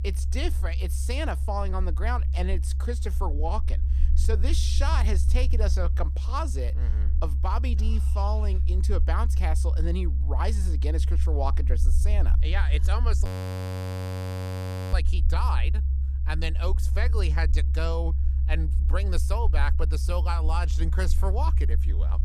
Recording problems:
low rumble; loud; throughout; 10 dB below the speech
audio freezing; at 13 s for 1.5 s

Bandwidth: 14.5 kHz